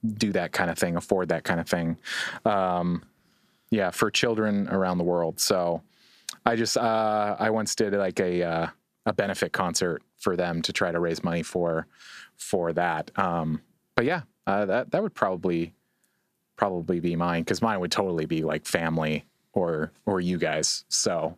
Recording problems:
squashed, flat; heavily

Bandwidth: 14.5 kHz